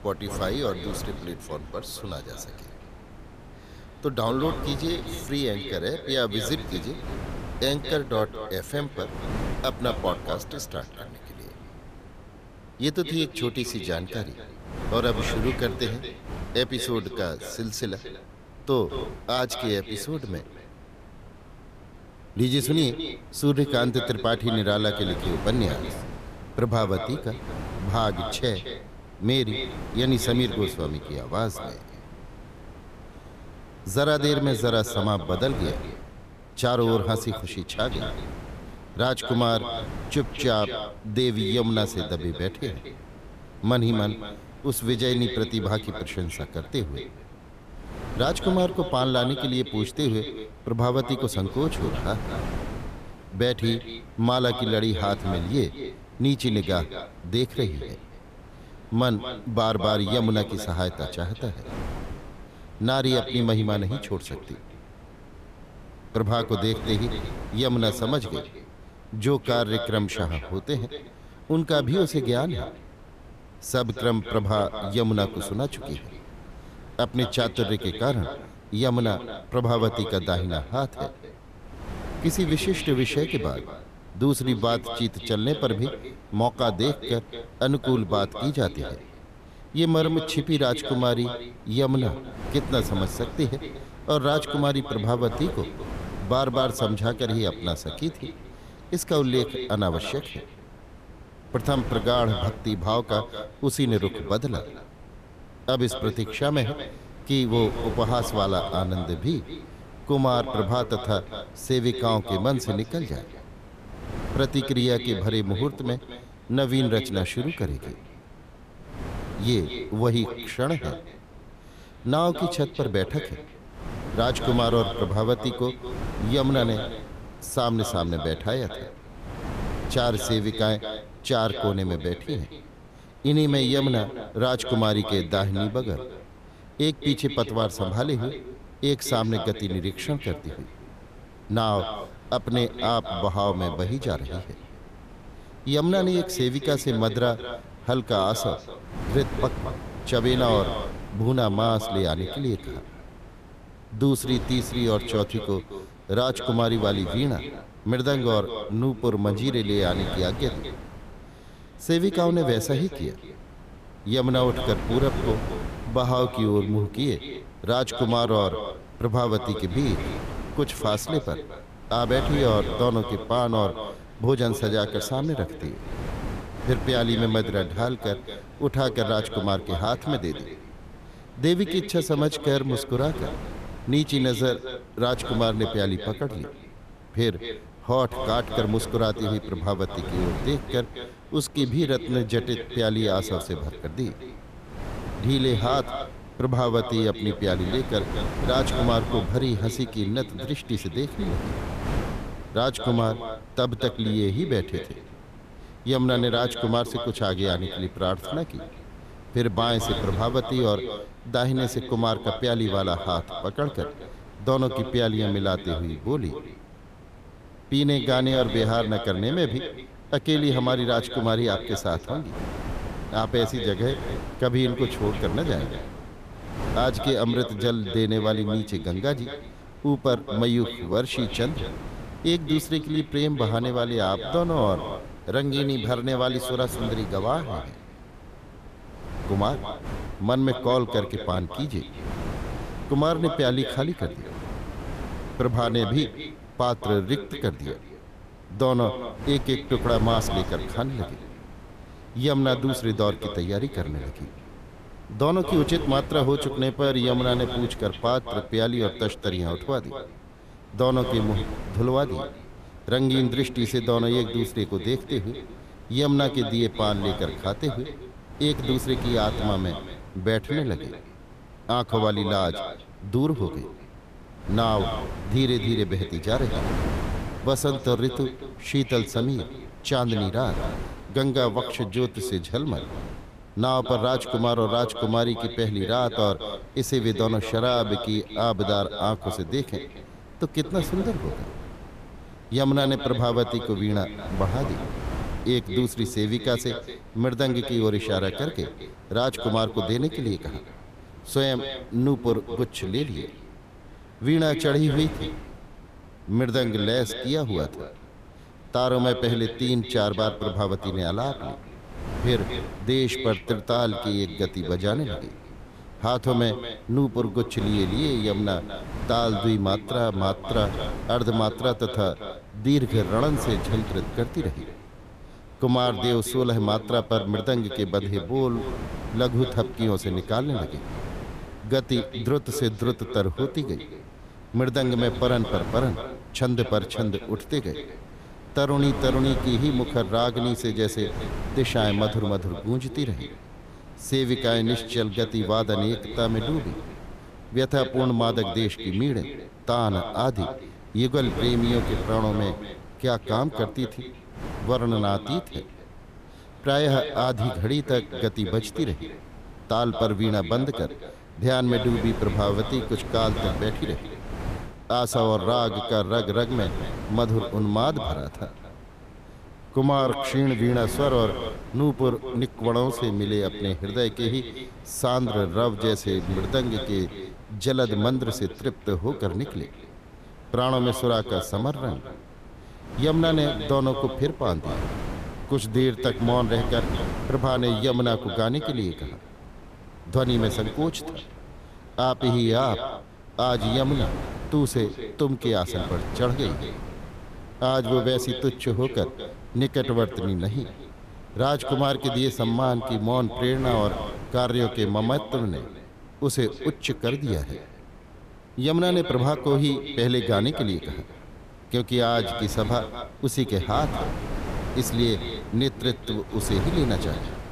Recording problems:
echo of what is said; strong; throughout; 220 ms later, 10 dB below the speech
wind noise on the microphone; occasional gusts; 15 dB below the speech

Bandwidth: 14.5 kHz